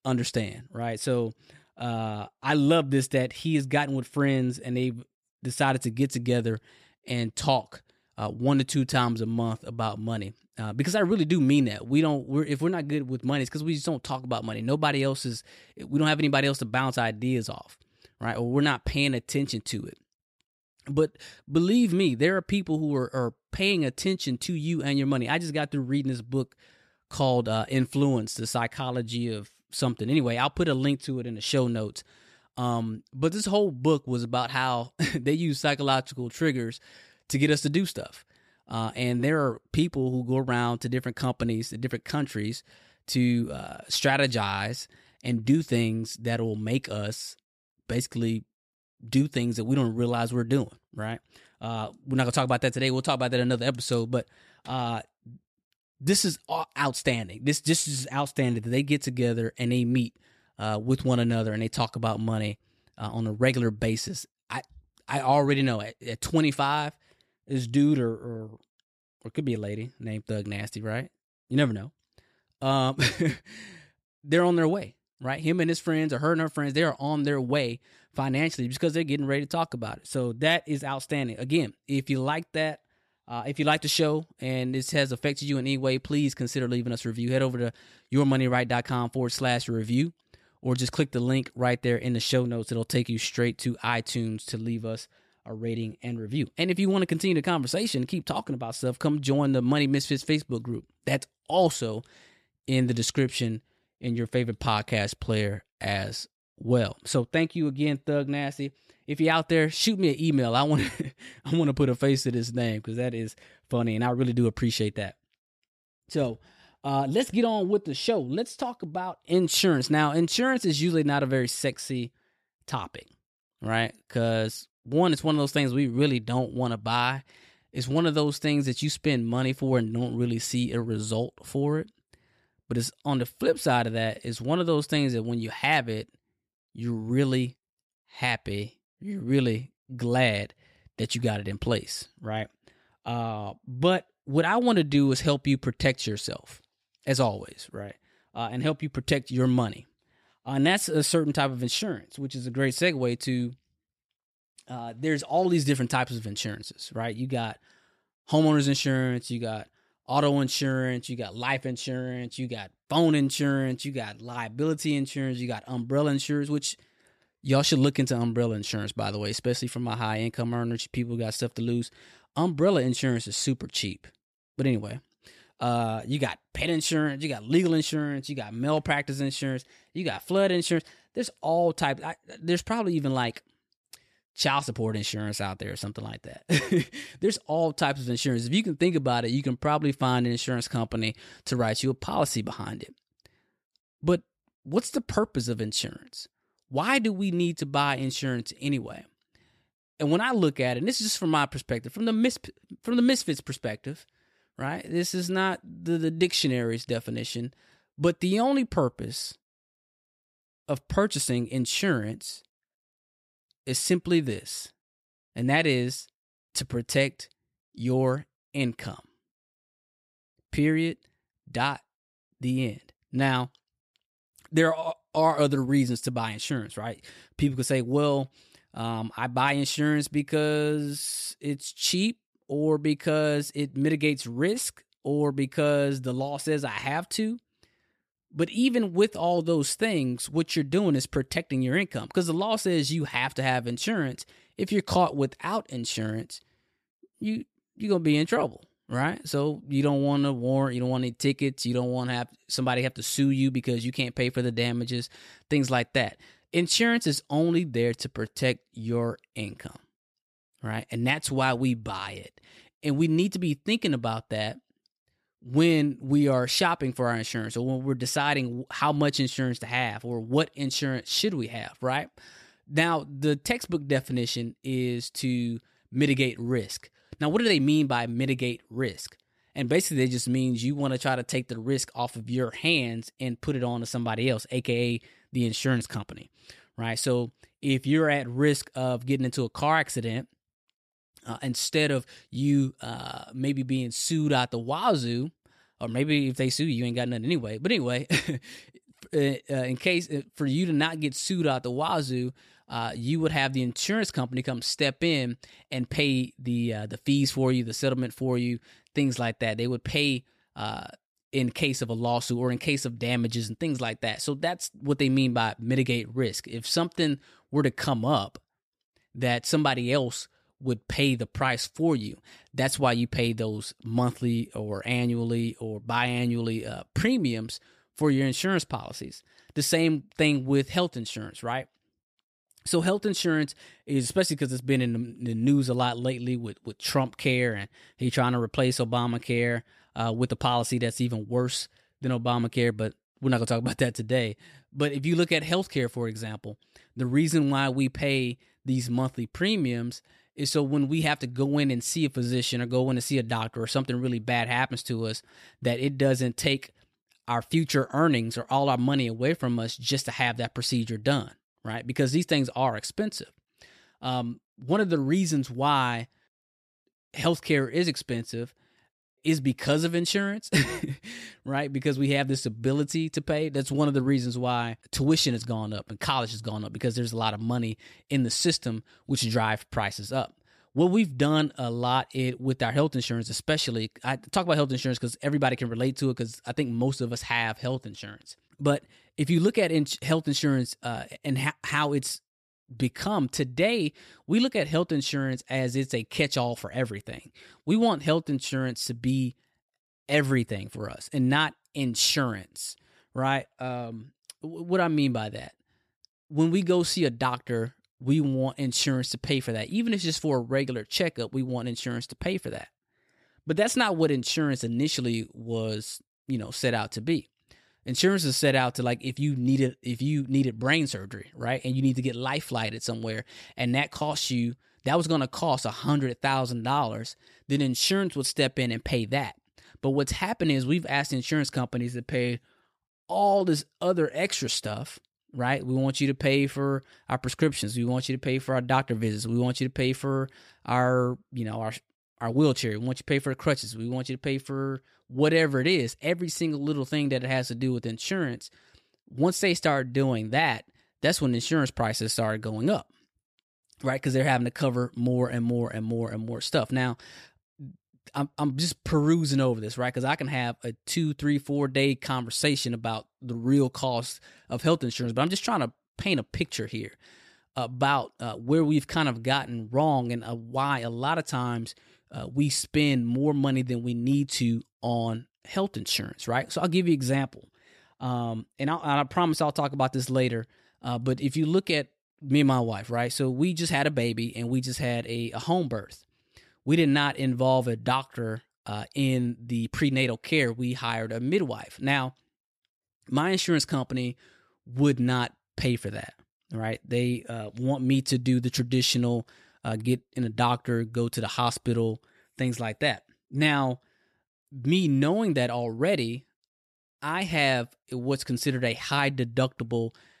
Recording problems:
none

